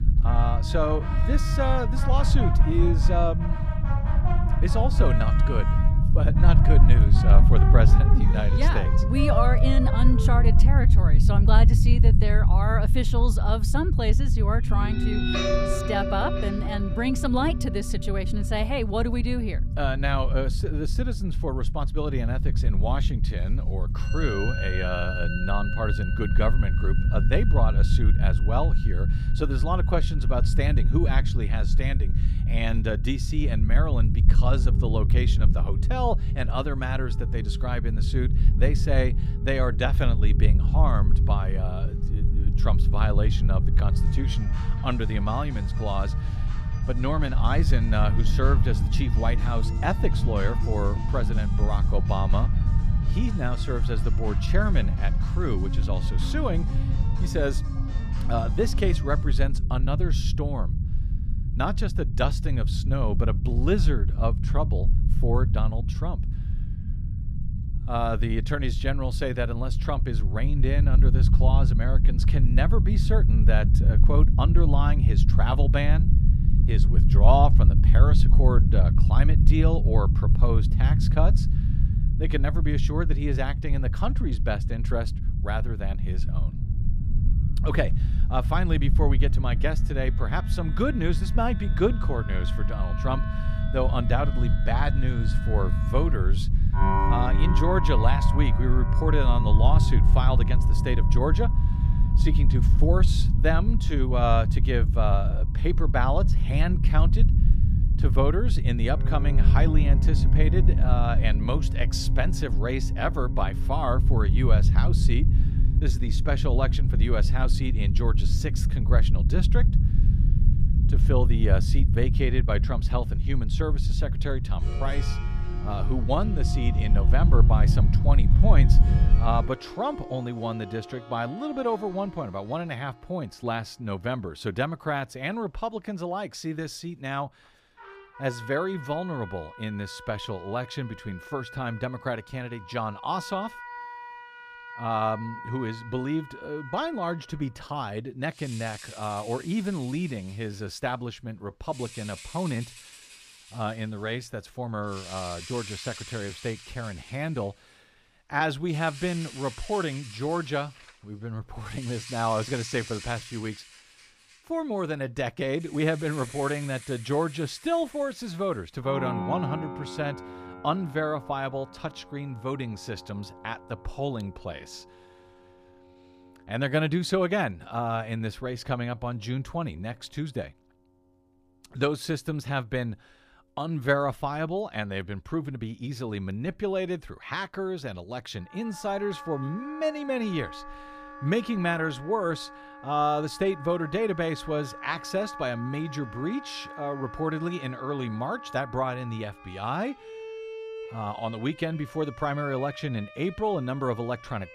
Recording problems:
background music; loud; throughout; 9 dB below the speech
low rumble; loud; until 2:09; 9 dB below the speech

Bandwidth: 15 kHz